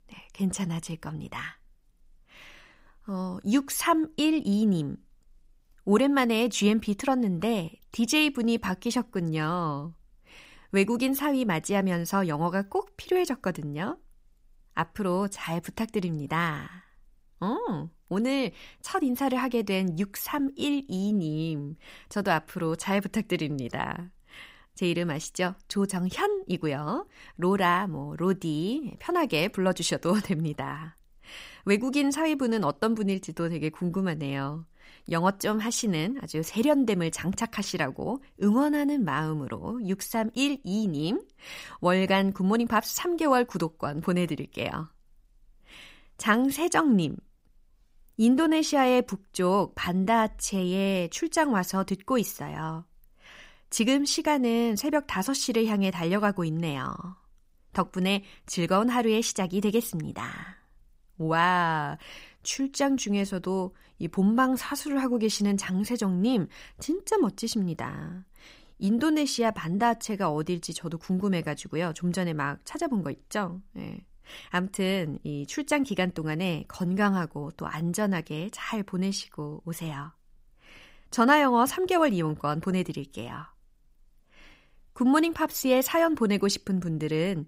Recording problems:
none

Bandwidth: 15.5 kHz